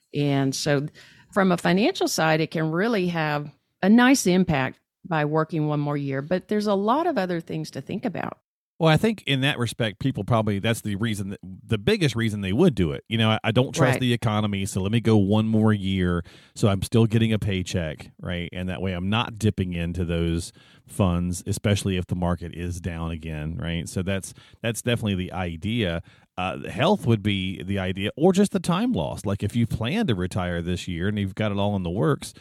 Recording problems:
none

